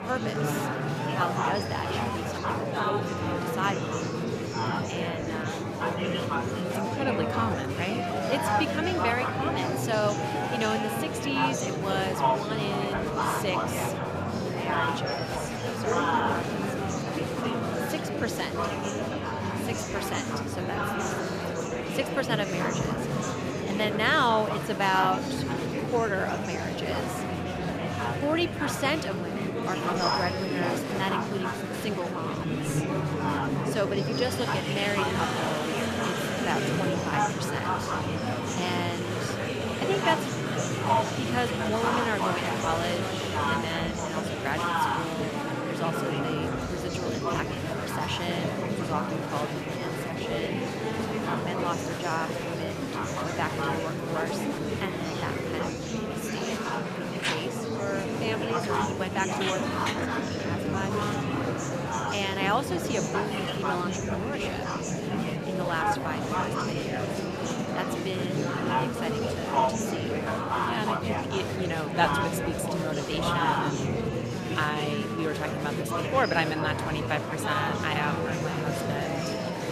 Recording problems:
murmuring crowd; very loud; throughout; 3 dB above the speech

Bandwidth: 14.5 kHz